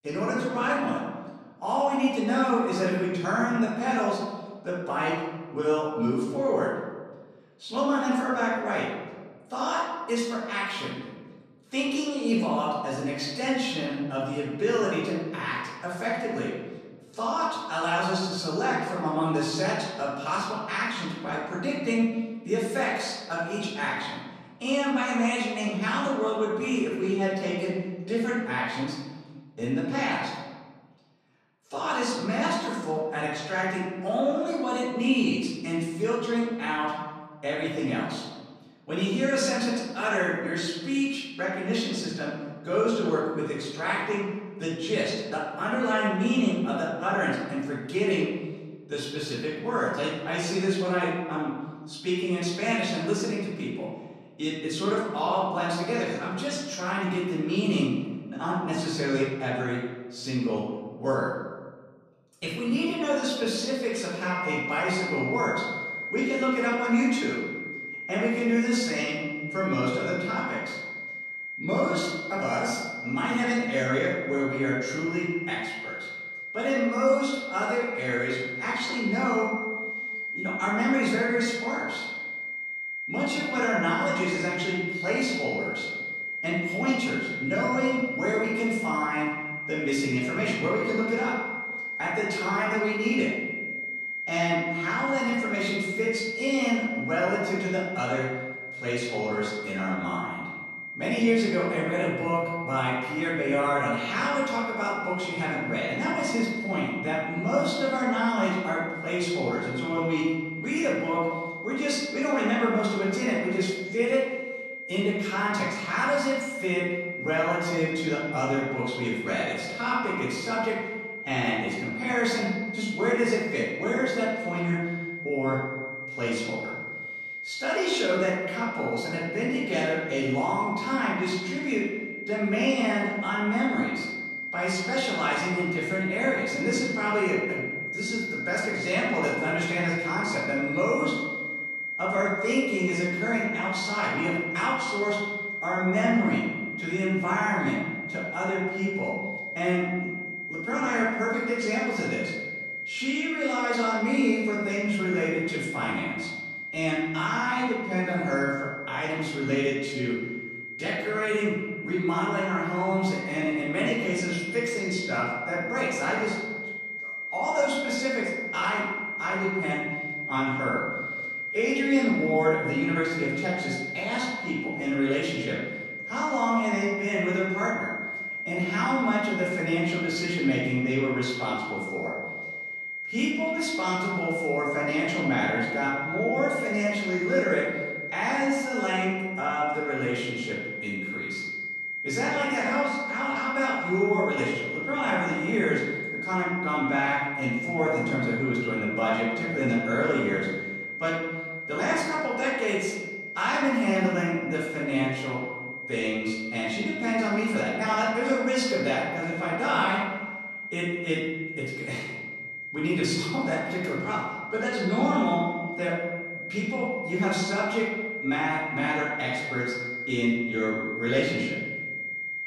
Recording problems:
off-mic speech; far
room echo; noticeable; dies away in 1.3 s
high-pitched whine; loud; from 1:04 on; 2 kHz, 5 dB below the speech

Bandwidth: 14 kHz